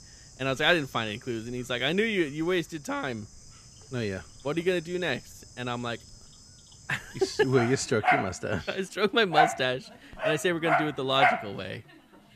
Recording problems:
animal sounds; very loud; throughout; 1 dB above the speech

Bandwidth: 14.5 kHz